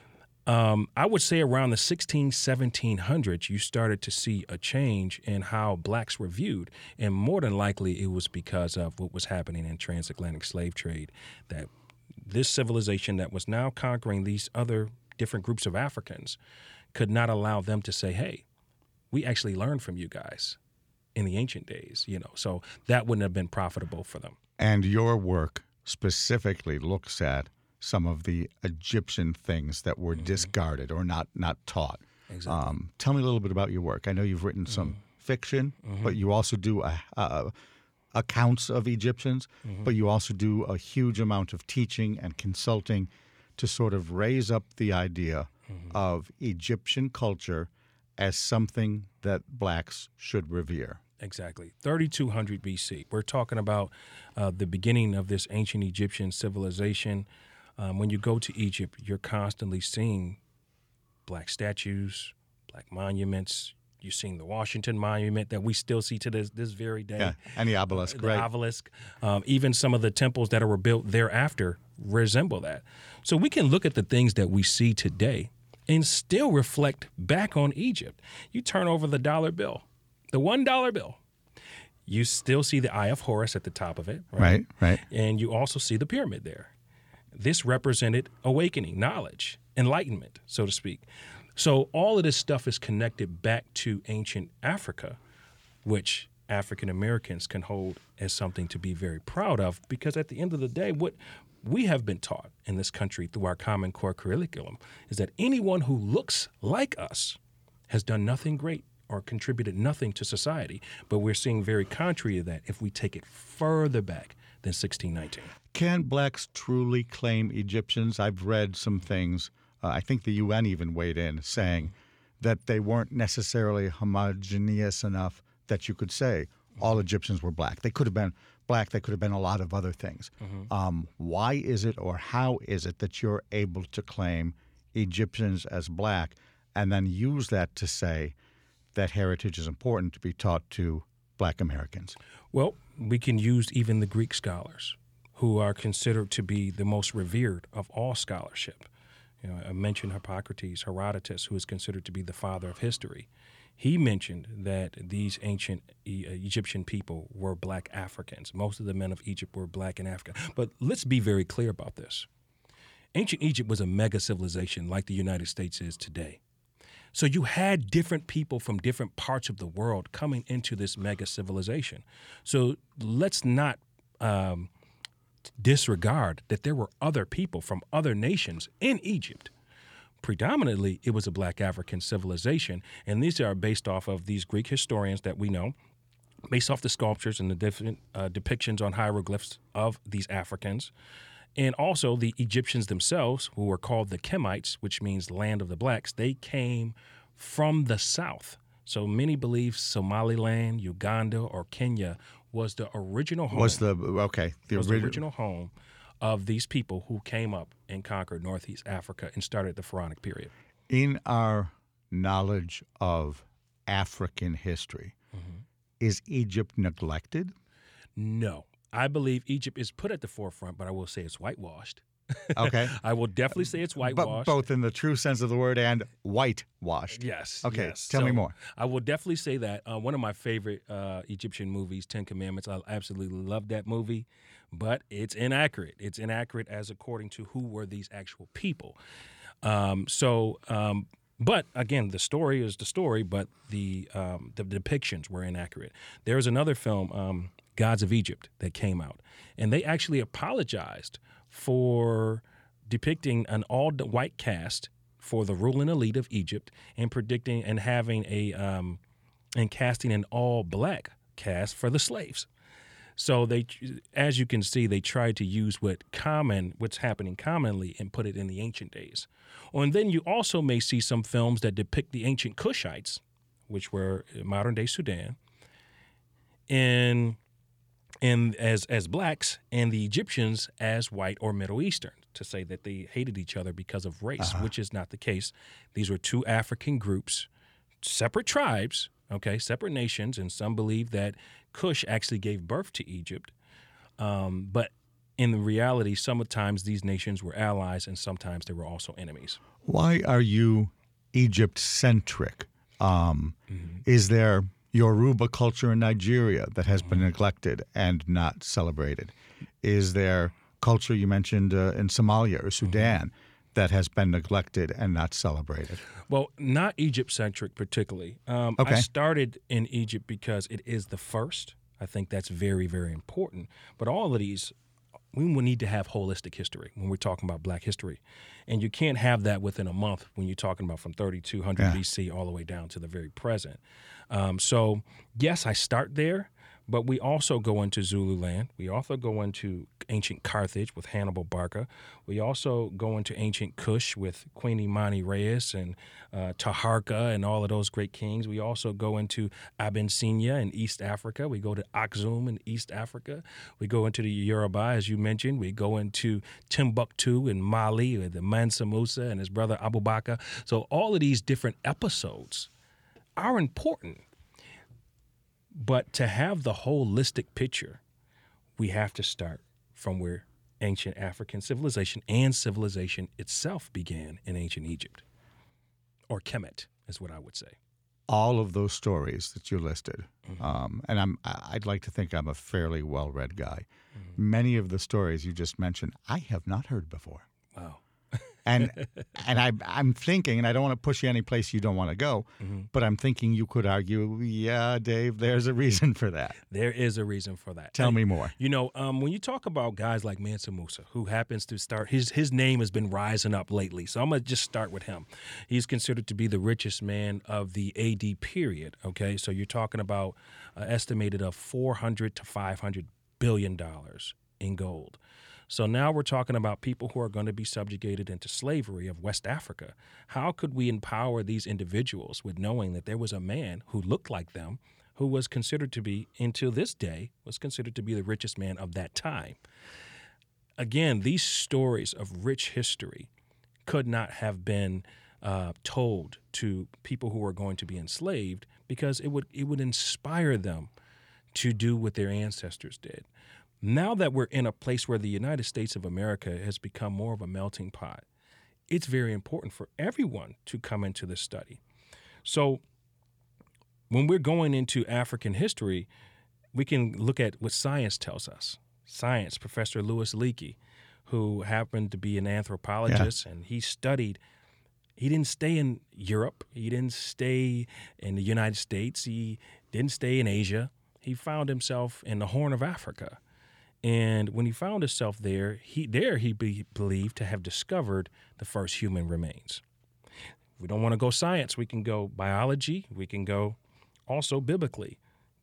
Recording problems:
none

